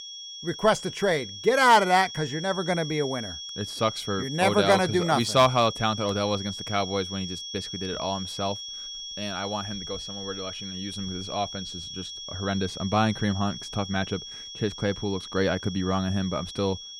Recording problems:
high-pitched whine; loud; throughout; 3.5 kHz, 9 dB below the speech

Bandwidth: 18.5 kHz